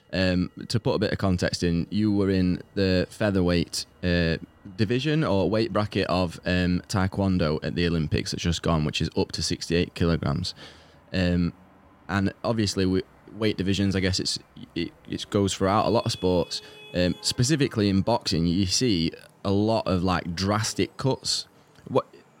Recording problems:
traffic noise; faint; throughout; 30 dB below the speech

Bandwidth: 16 kHz